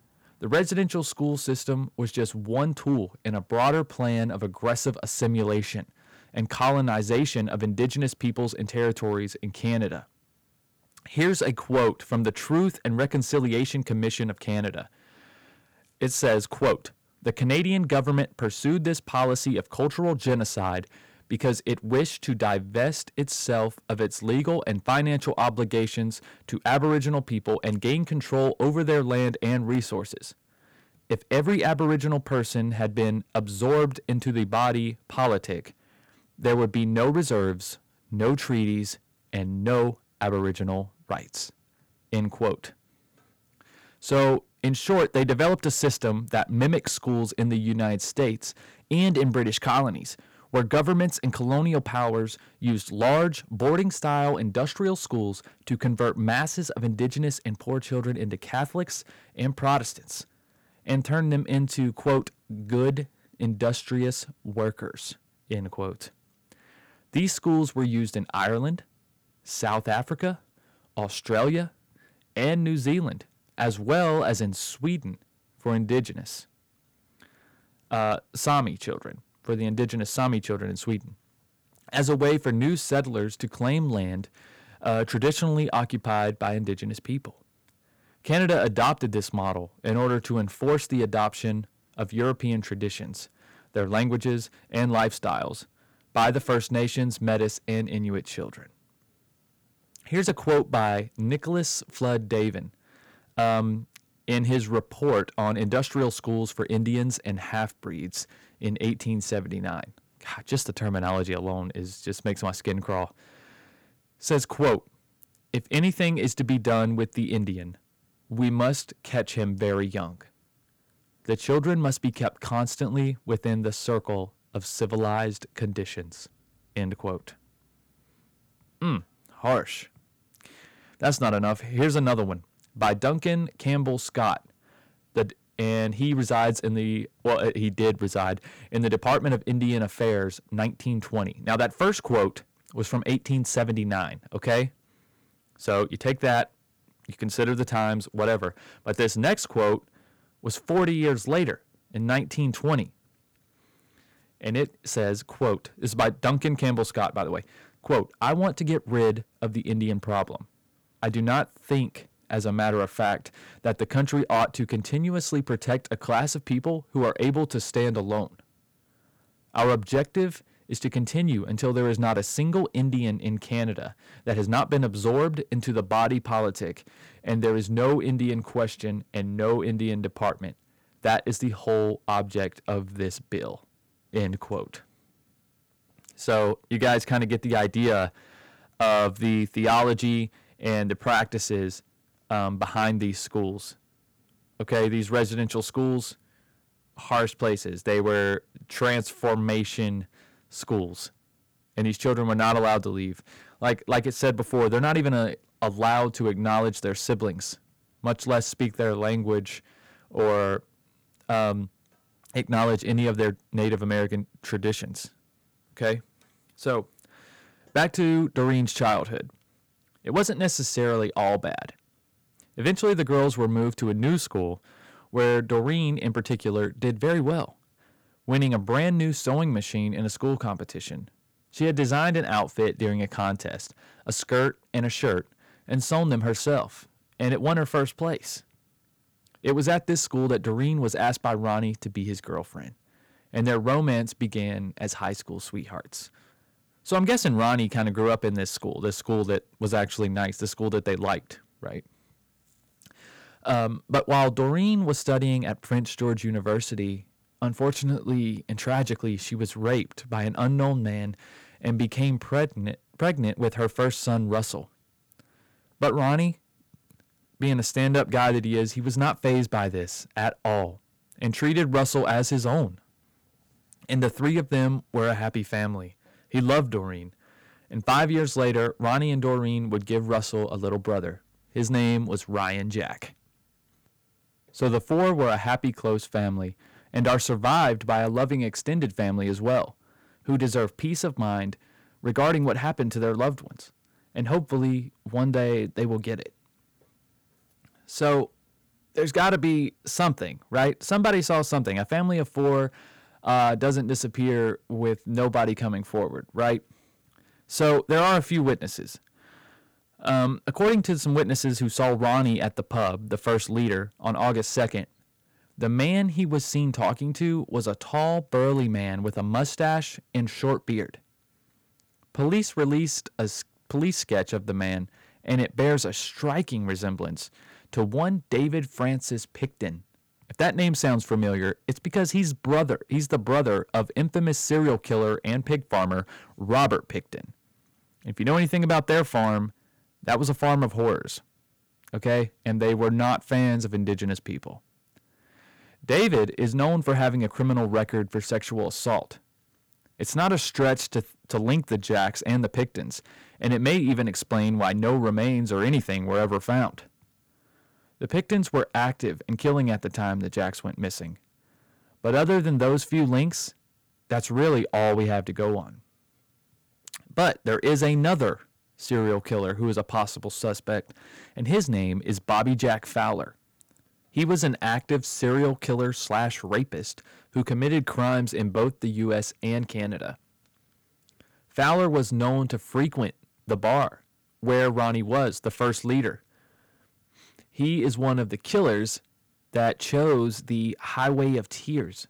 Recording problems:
distortion; slight; 4% of the sound clipped

